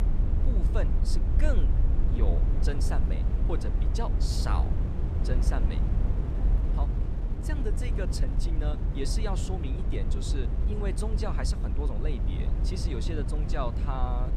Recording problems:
low rumble; loud; throughout; 5 dB below the speech
wind noise on the microphone; occasional gusts; 10 dB below the speech

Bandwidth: 13.5 kHz